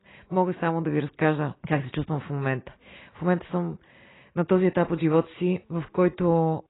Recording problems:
garbled, watery; badly; nothing above 4 kHz

